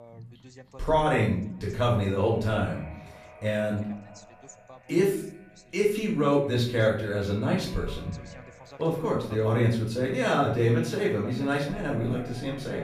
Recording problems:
off-mic speech; far
room echo; noticeable; dies away in 0.5 s
echo of what is said; faint; throughout; 420 ms later, 25 dB below the speech
voice in the background; faint; throughout; 25 dB below the speech

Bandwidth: 15 kHz